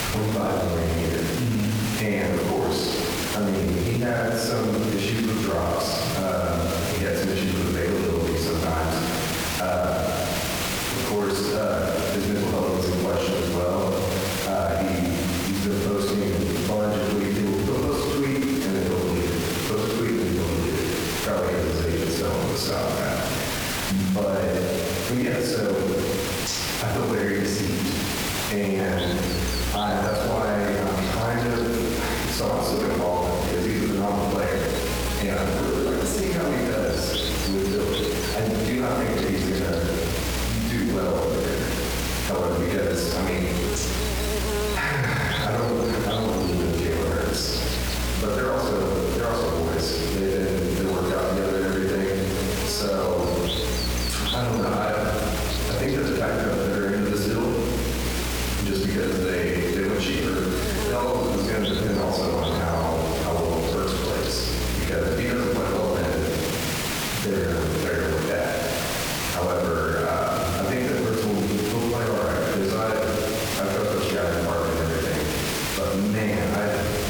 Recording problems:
off-mic speech; far
room echo; noticeable; dies away in 1.3 s
squashed, flat; somewhat
electrical hum; loud; from 29 s to 1:06; 60 Hz, 9 dB below the speech
hiss; loud; throughout; 7 dB below the speech

